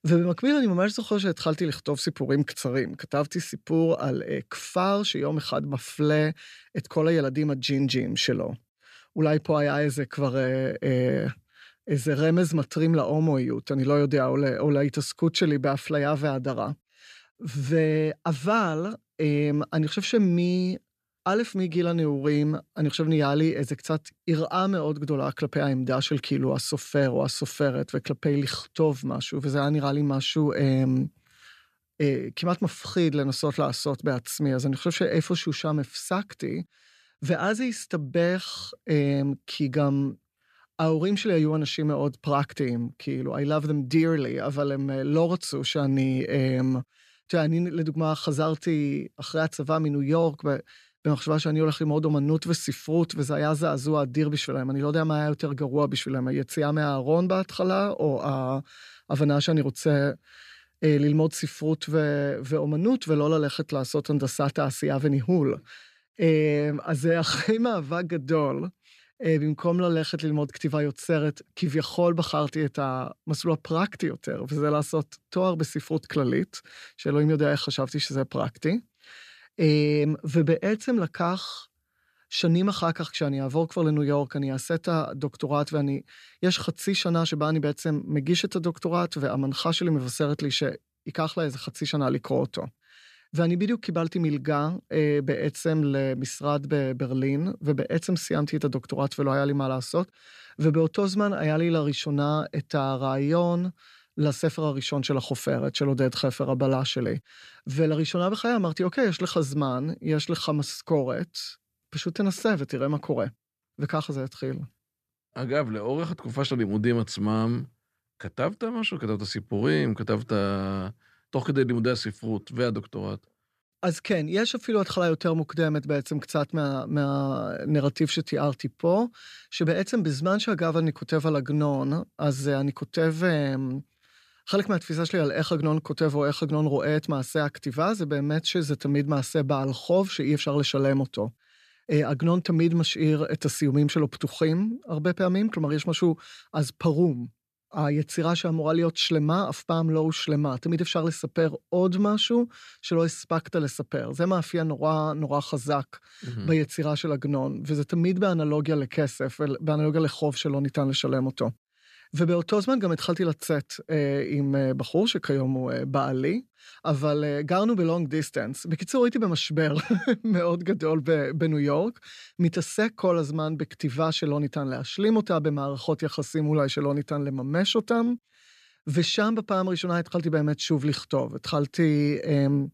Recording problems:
none

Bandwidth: 14.5 kHz